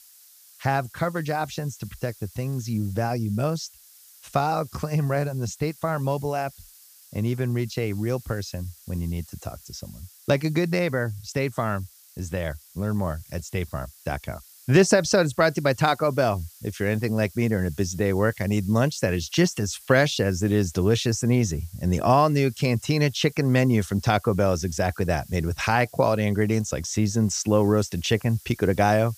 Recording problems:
hiss; faint; throughout; 25 dB below the speech

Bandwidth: 15 kHz